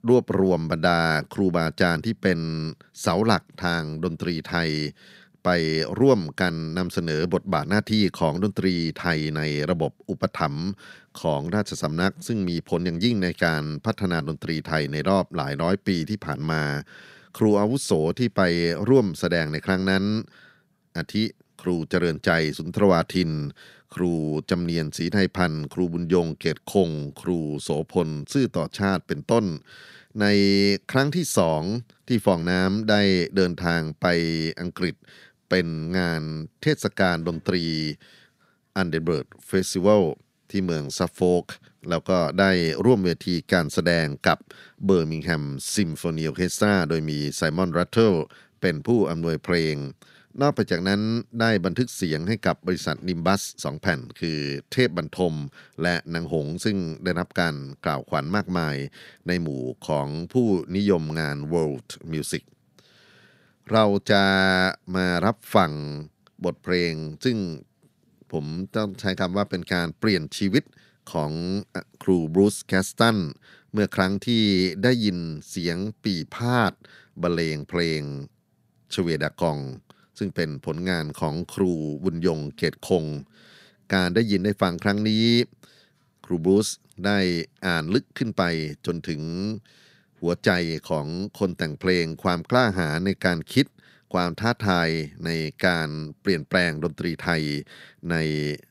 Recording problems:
none

